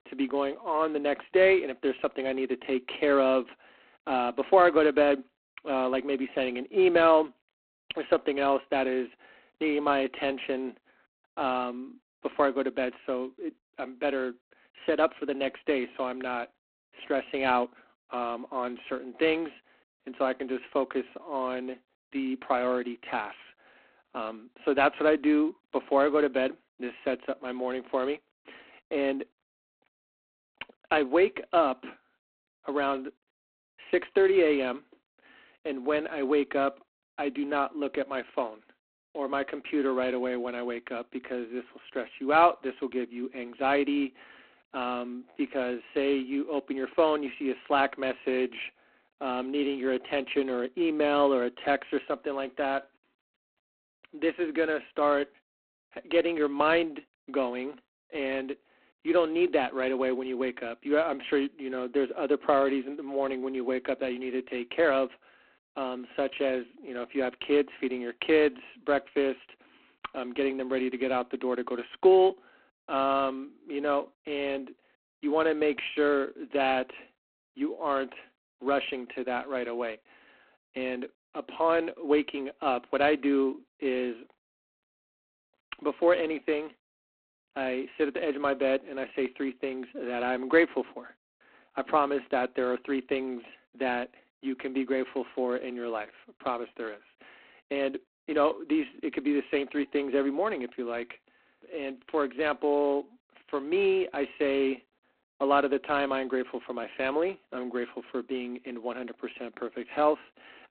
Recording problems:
phone-call audio; poor line; nothing above 3.5 kHz

